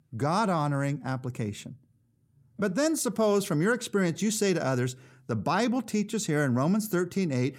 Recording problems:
none

